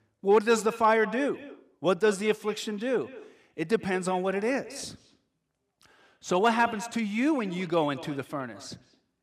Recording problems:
echo of what is said; noticeable; throughout; 210 ms later, 15 dB below the speech

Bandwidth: 15 kHz